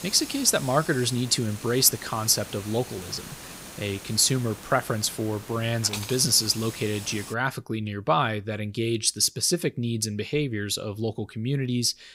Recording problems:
hiss; noticeable; until 7.5 s; 15 dB below the speech

